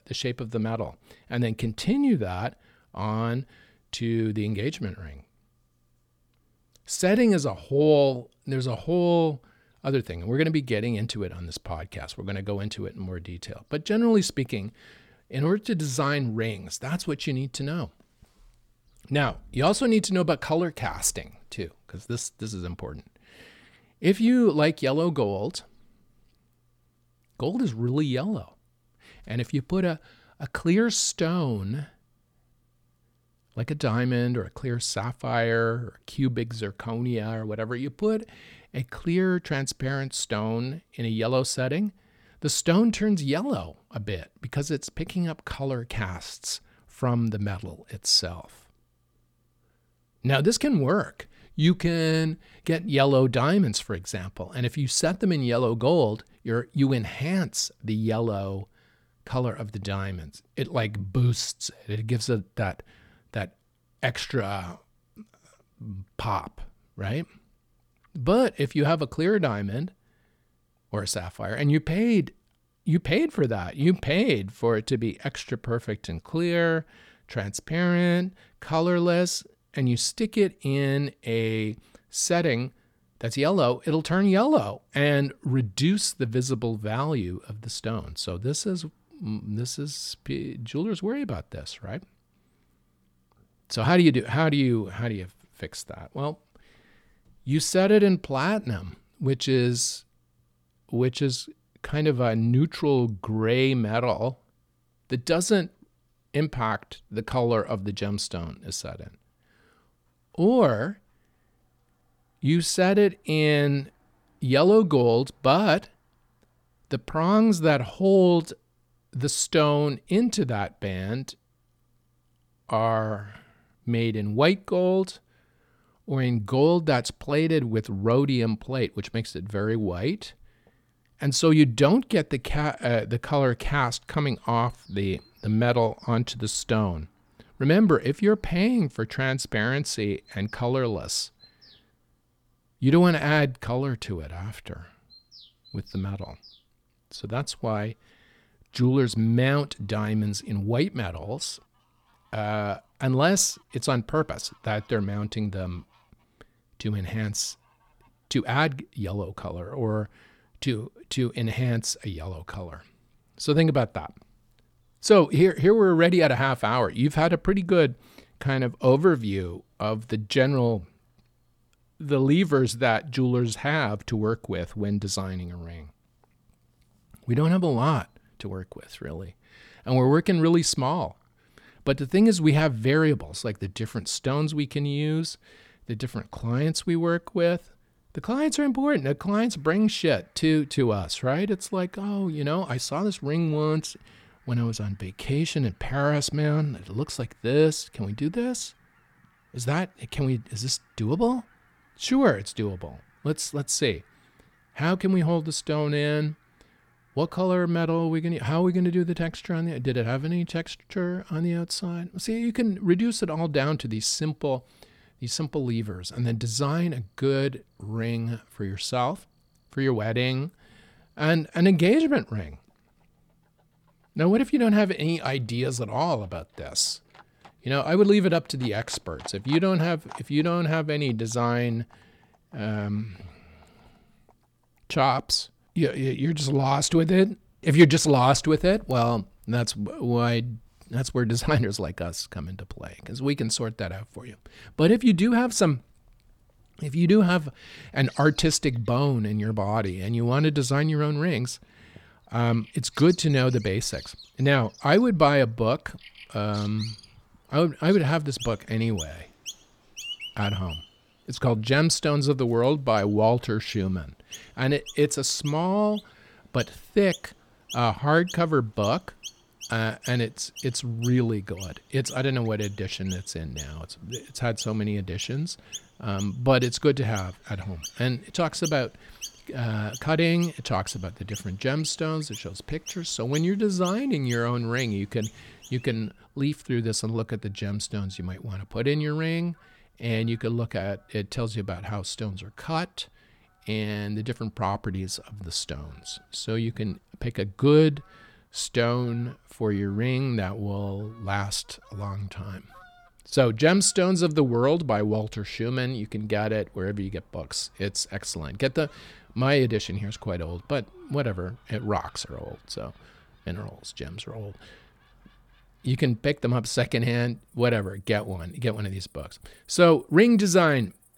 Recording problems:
animal sounds; faint; throughout; 20 dB below the speech

